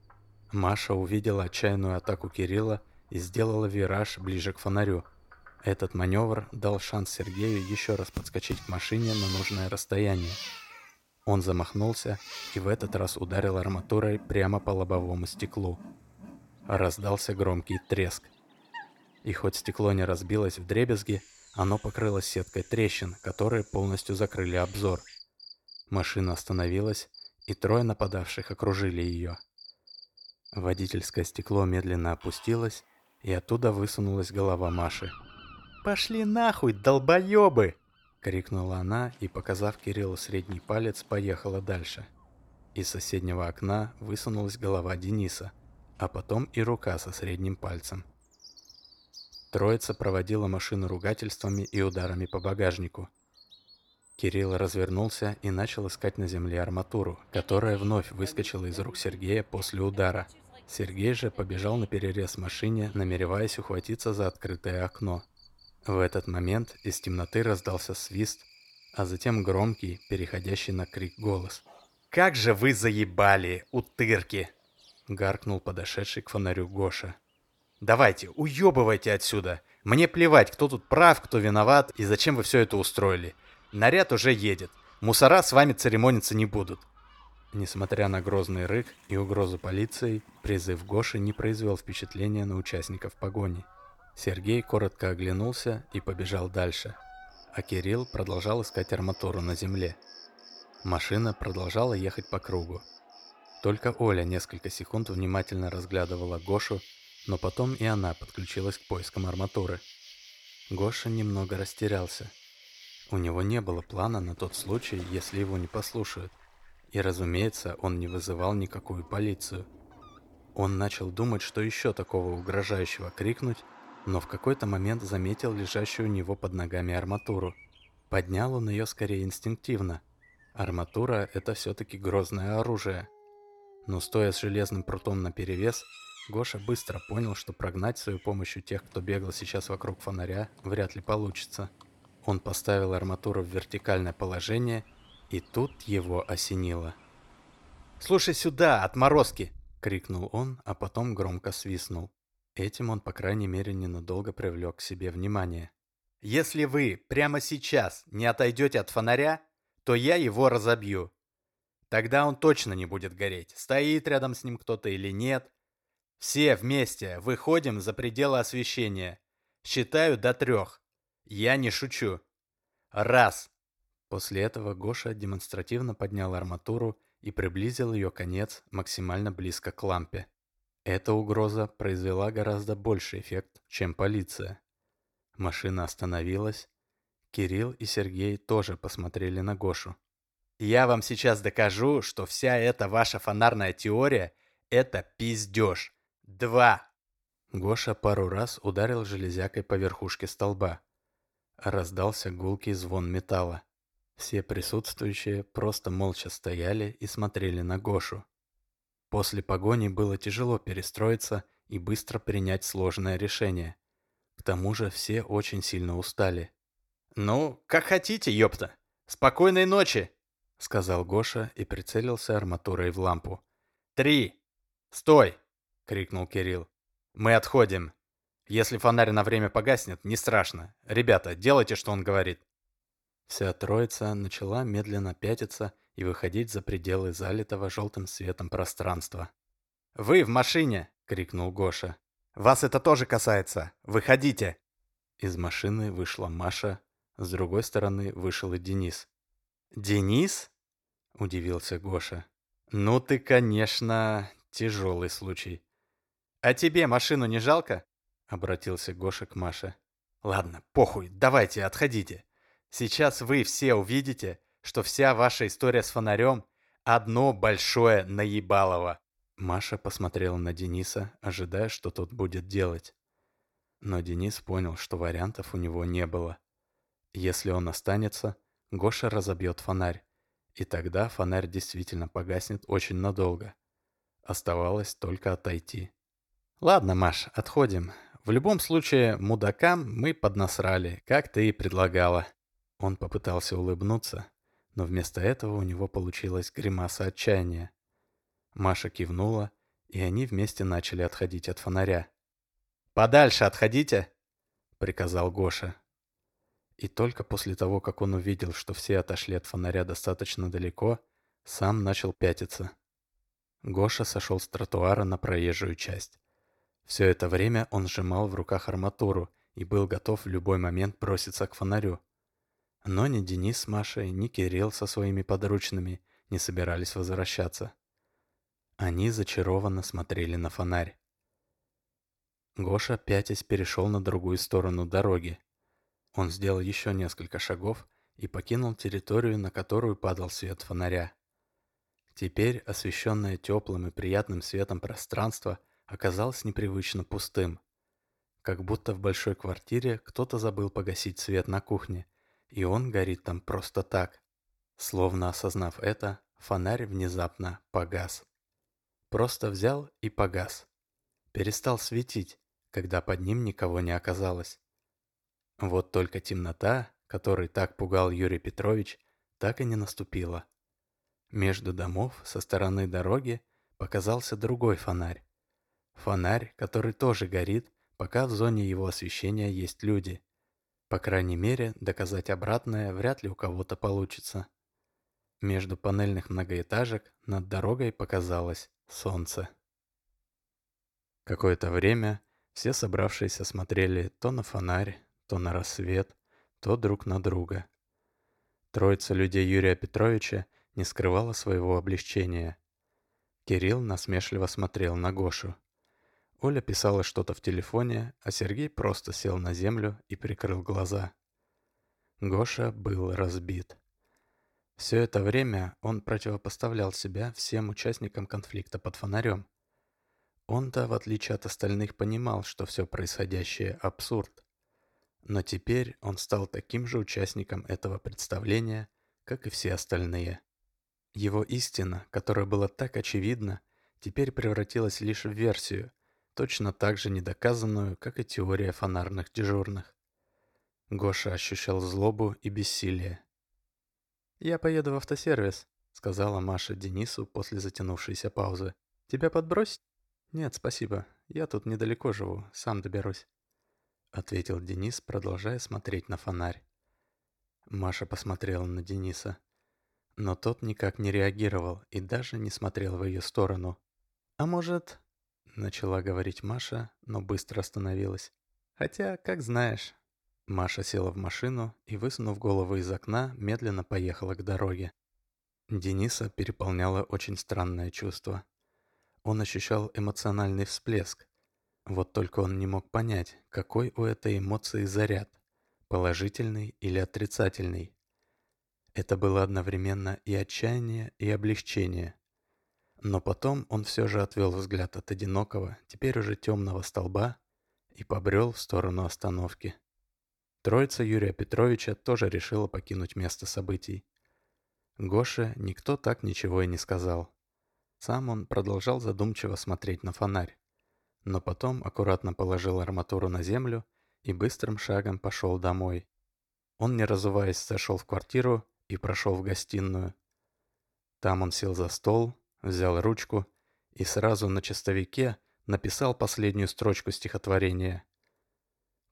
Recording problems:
animal sounds; faint; until 2:30; 20 dB below the speech

